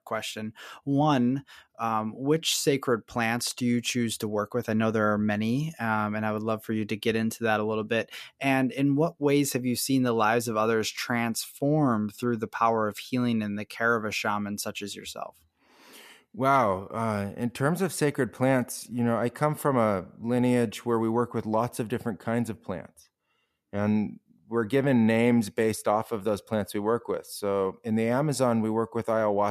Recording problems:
abrupt cut into speech; at the end

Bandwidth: 14.5 kHz